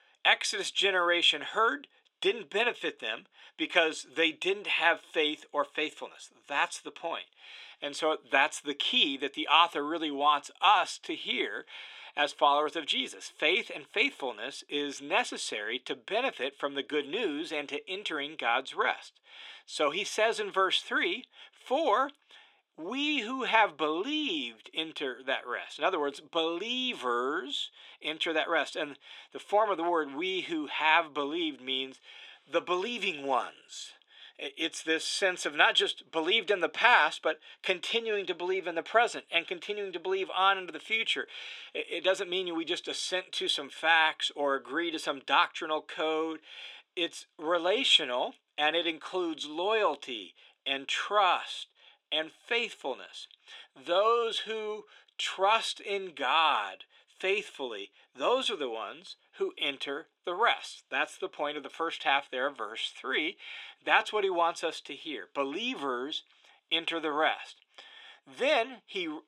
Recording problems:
thin; somewhat; fading below 400 Hz

